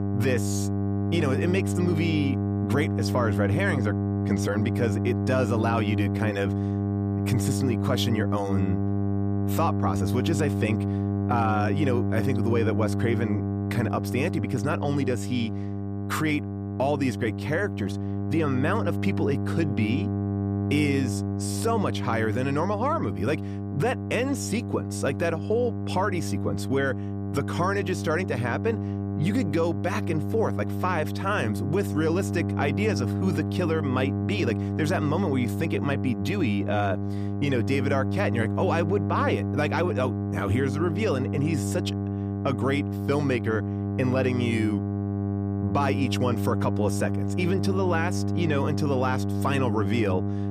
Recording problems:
electrical hum; loud; throughout; 50 Hz, 6 dB below the speech

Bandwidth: 15 kHz